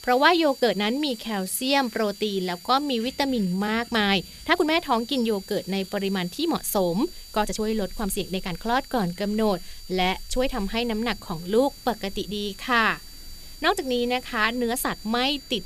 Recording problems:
high-pitched whine; noticeable; throughout; 4.5 kHz, 20 dB below the speech
rain or running water; faint; throughout; 25 dB below the speech
hiss; faint; throughout; 25 dB below the speech
uneven, jittery; strongly; from 0.5 to 15 s

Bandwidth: 14.5 kHz